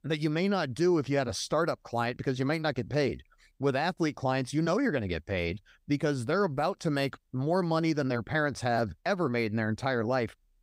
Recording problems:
none

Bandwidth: 15.5 kHz